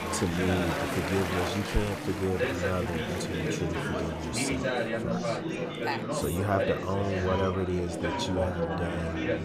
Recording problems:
murmuring crowd; very loud; throughout; as loud as the speech

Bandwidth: 14.5 kHz